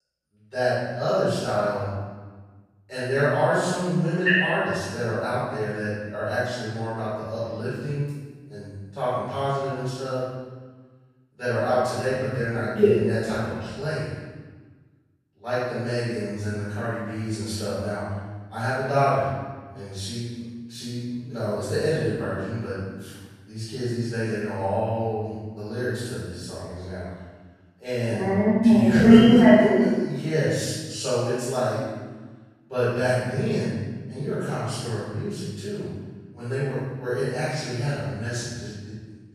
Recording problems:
room echo; strong; dies away in 1.3 s
off-mic speech; far

